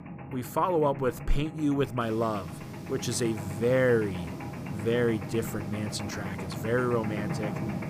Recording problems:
machinery noise; loud; throughout; 8 dB below the speech
hiss; faint; from 2 s on; 25 dB below the speech

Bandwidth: 15 kHz